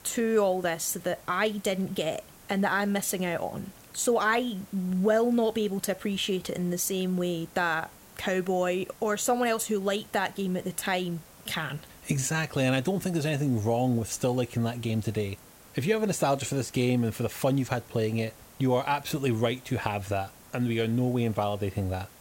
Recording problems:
hiss; faint; throughout; 20 dB below the speech

